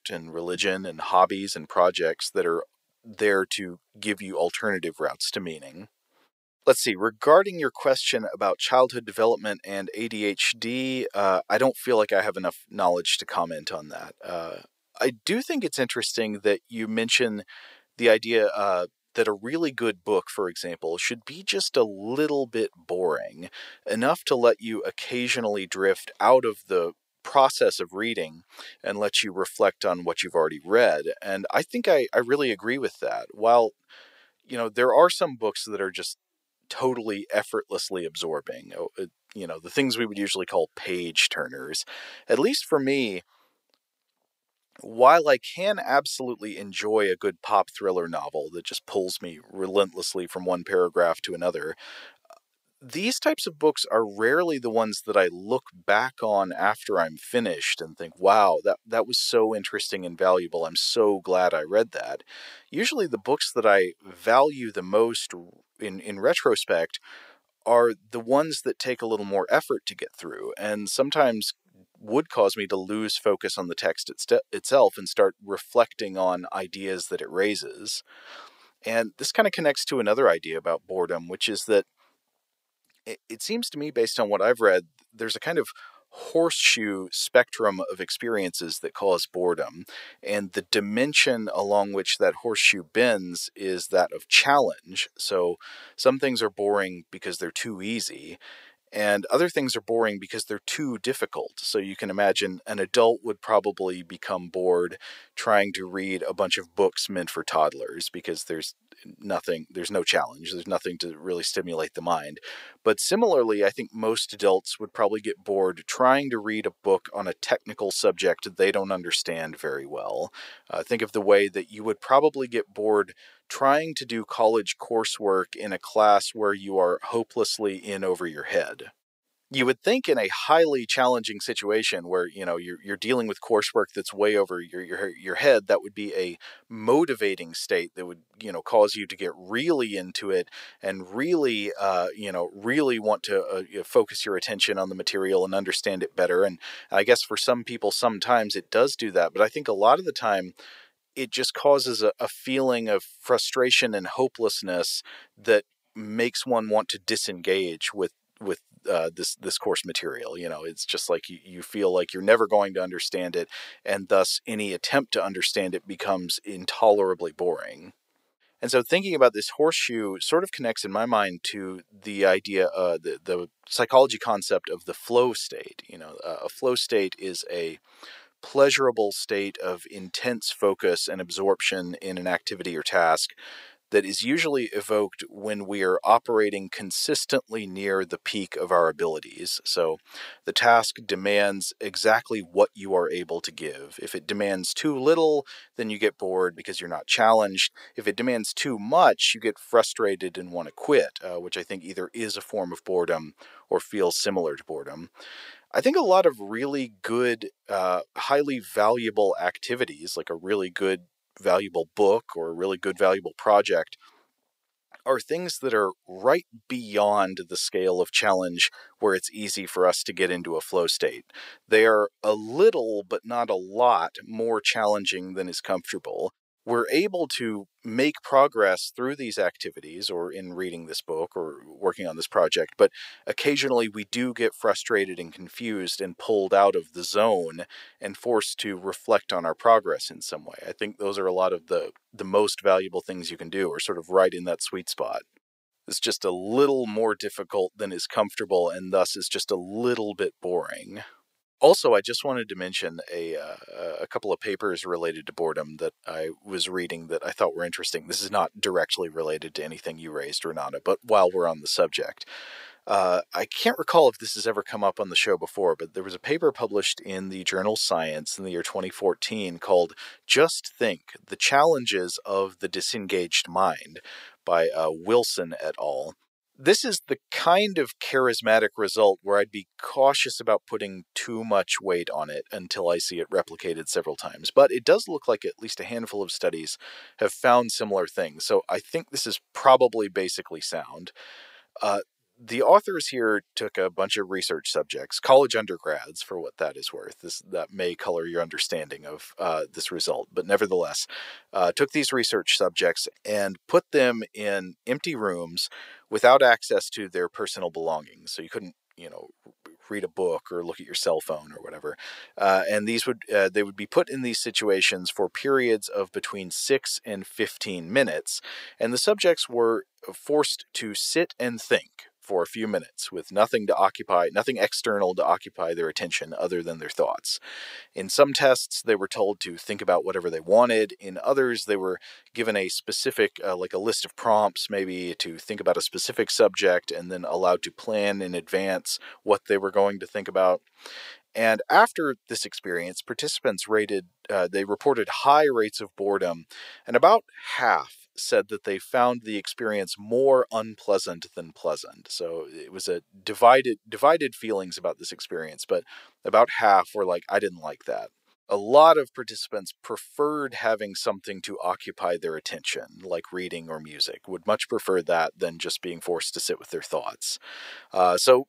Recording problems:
thin; very; fading below 550 Hz

